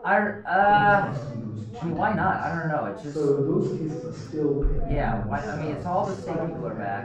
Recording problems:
off-mic speech; far
room echo; noticeable; dies away in 0.3 s
muffled; slightly; fading above 2.5 kHz
background chatter; loud; throughout; 2 voices, 4 dB below the speech
uneven, jittery; strongly; from 0.5 to 6.5 s

